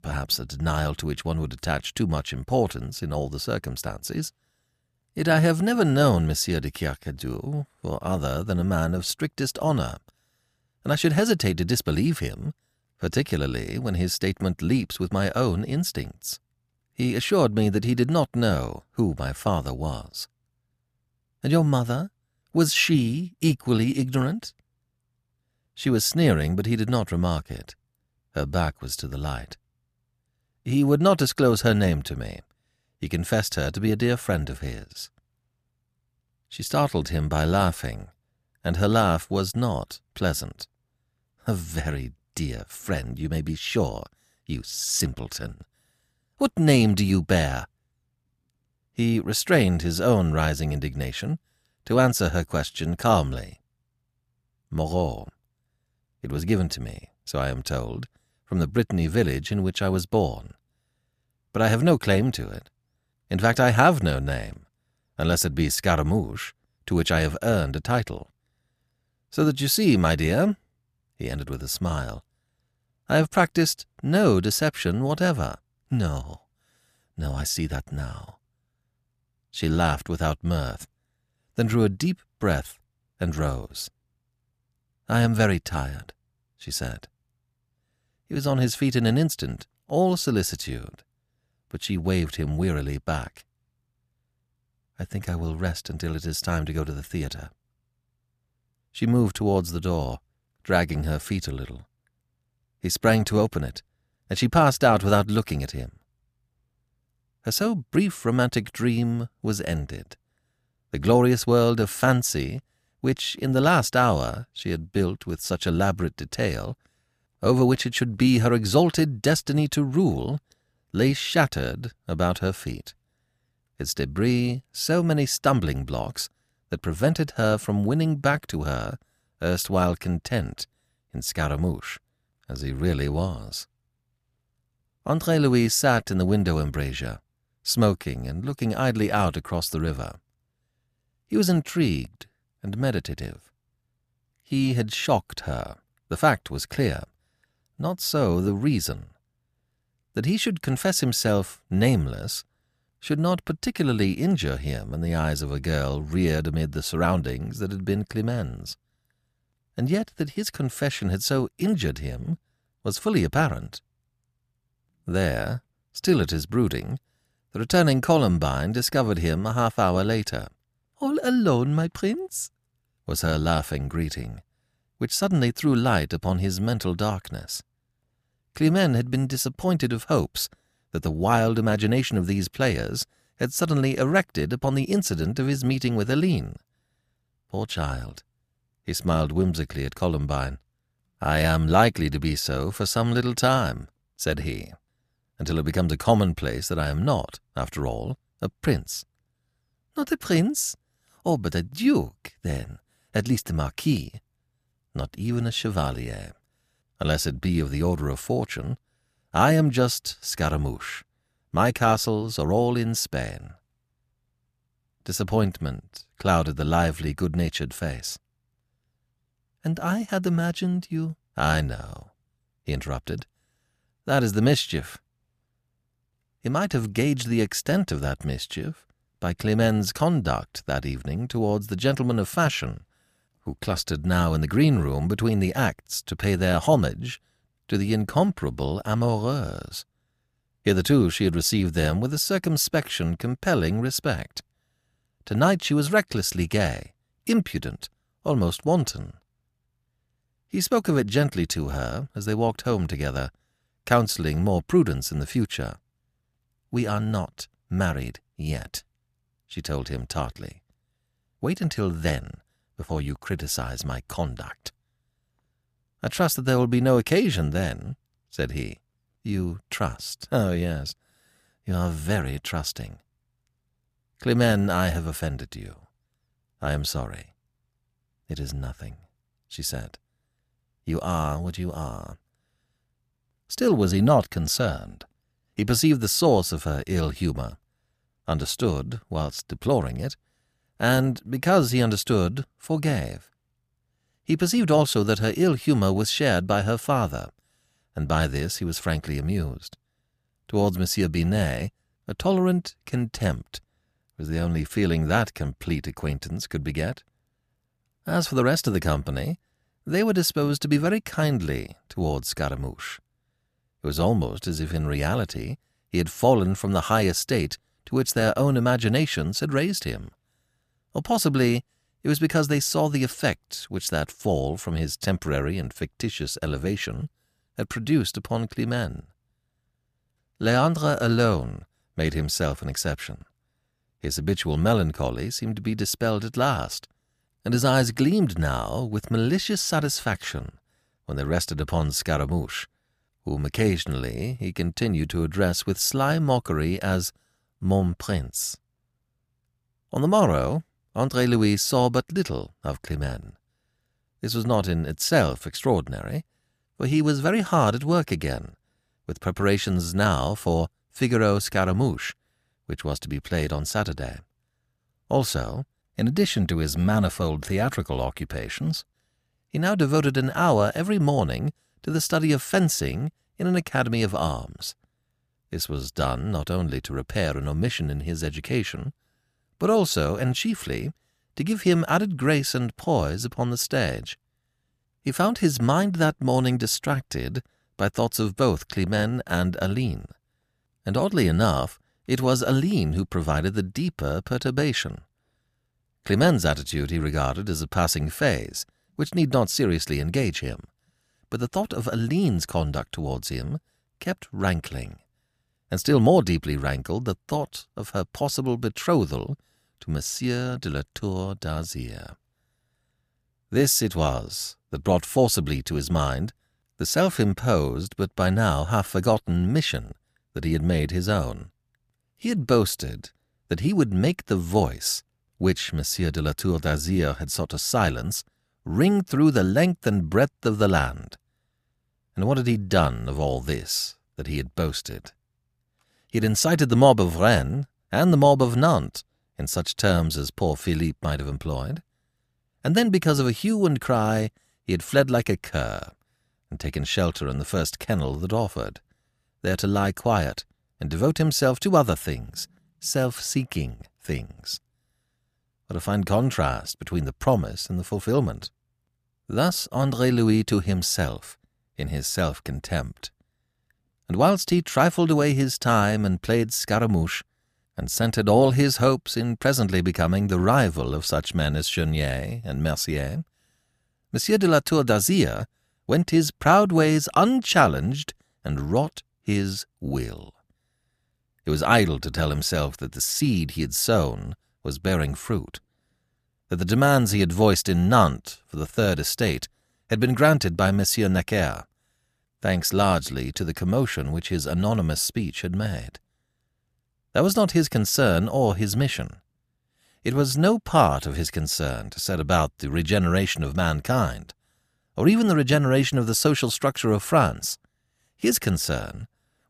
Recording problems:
none

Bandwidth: 14.5 kHz